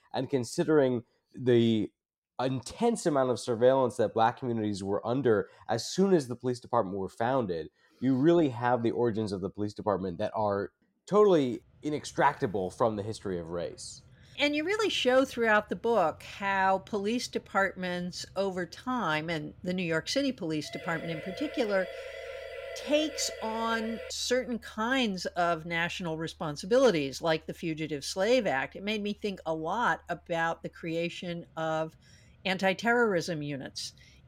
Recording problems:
machinery noise; faint; from 12 s on; 30 dB below the speech
siren; faint; from 21 to 24 s; peak 10 dB below the speech

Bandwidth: 16 kHz